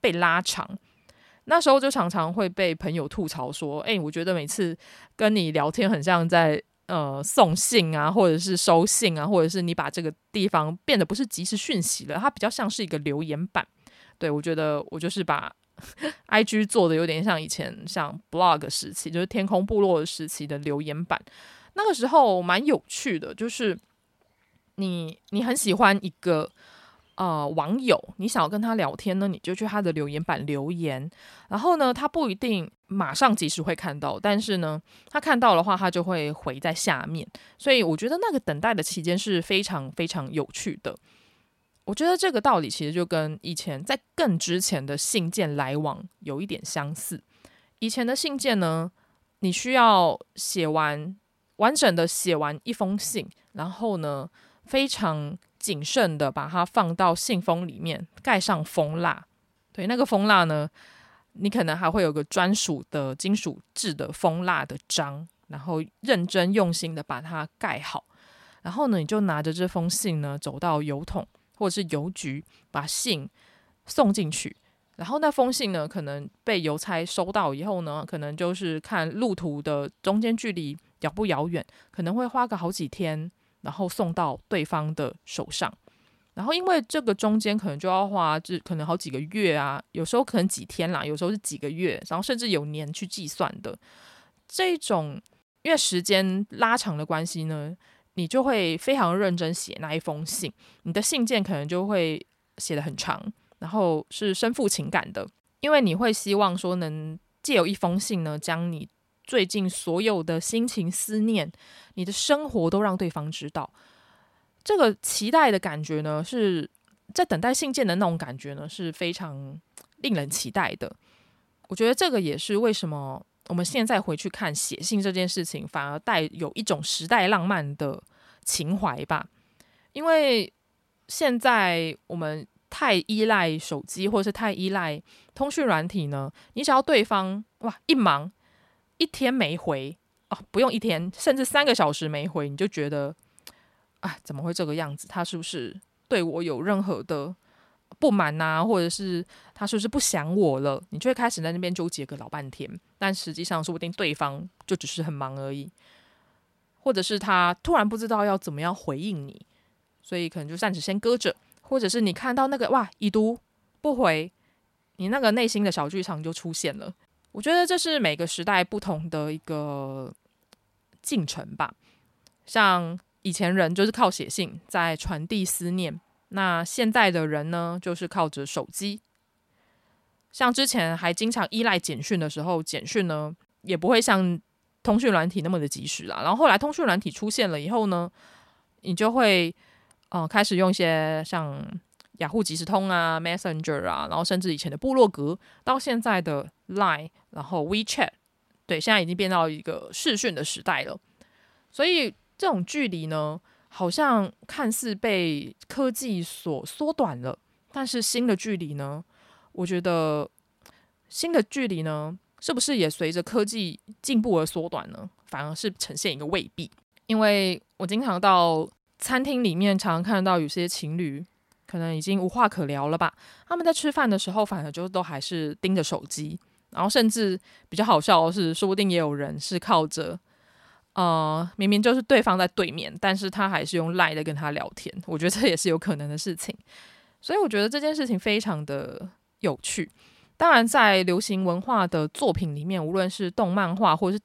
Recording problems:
none

